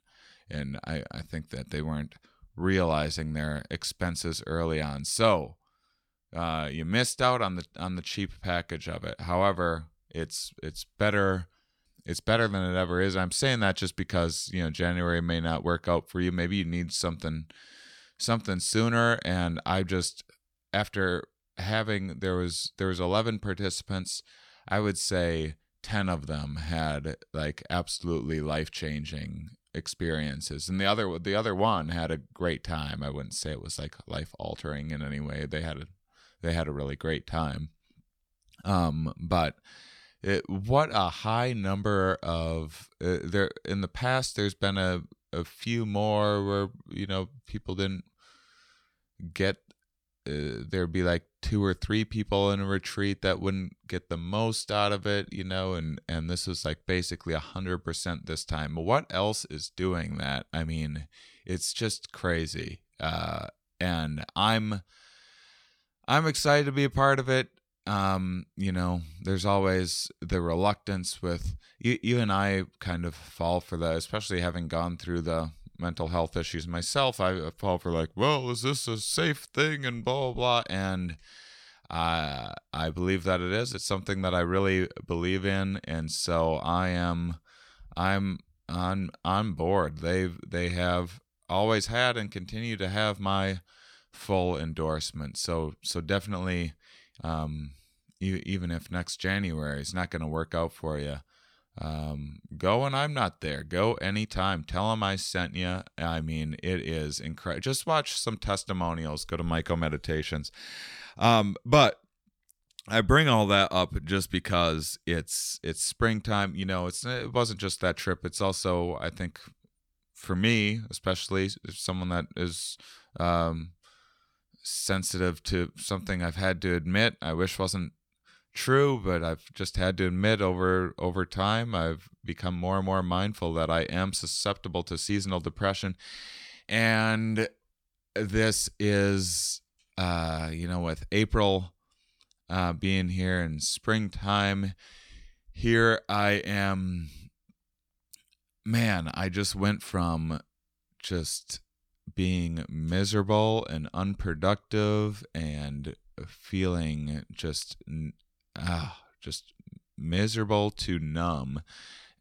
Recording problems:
none

